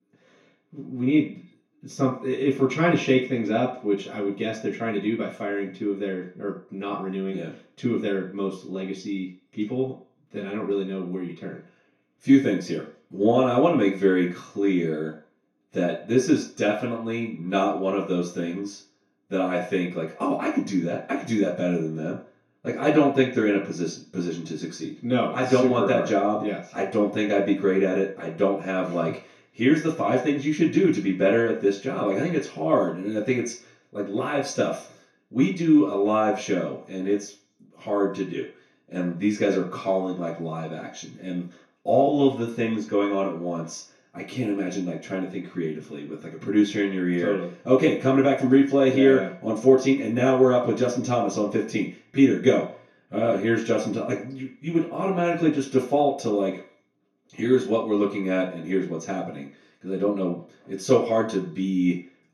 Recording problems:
off-mic speech; far
room echo; noticeable; dies away in 0.4 s

